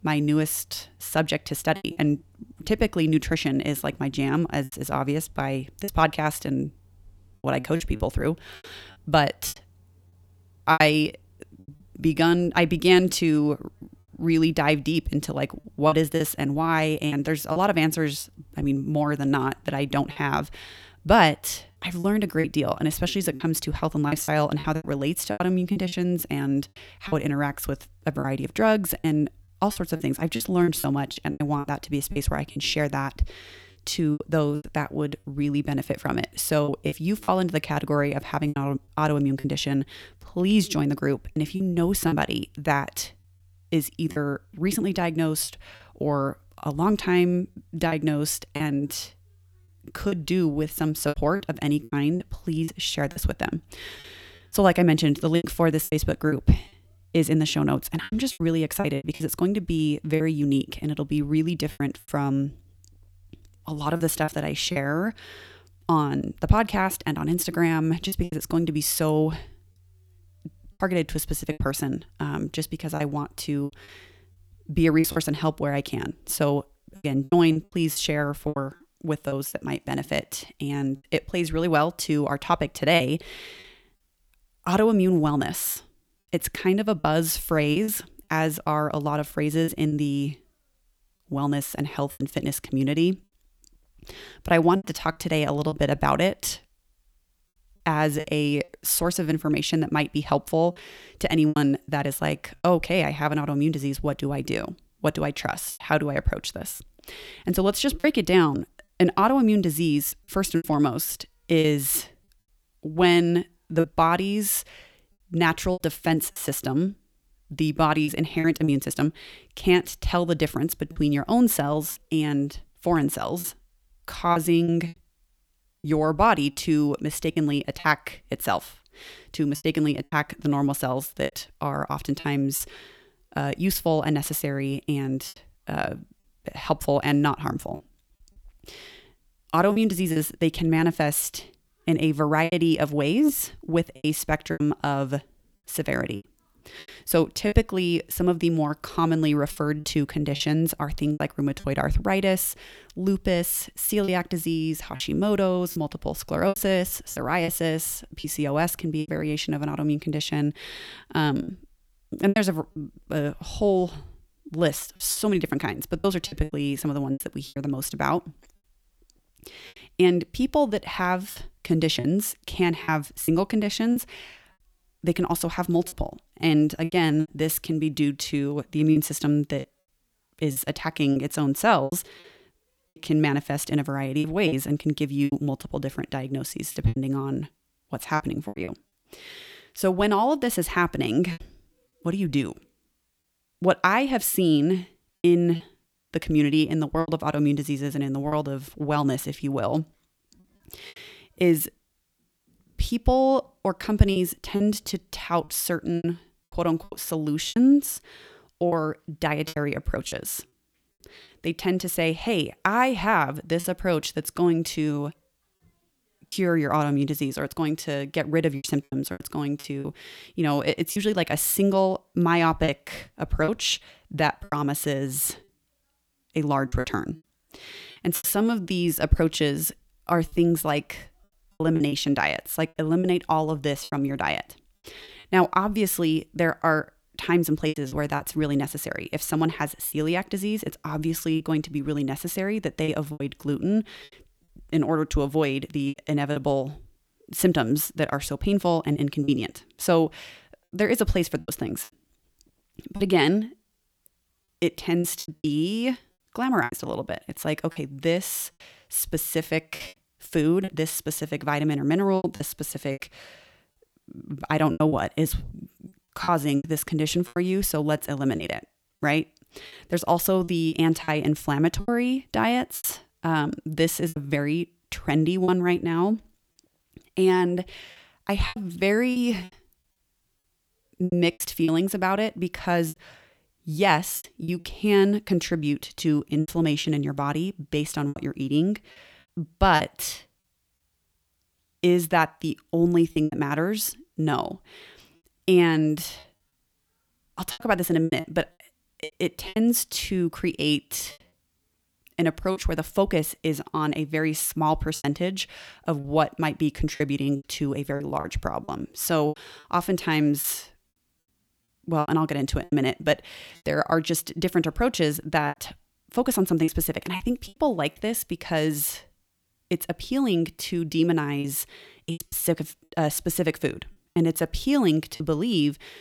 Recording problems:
choppy; very; 7% of the speech affected

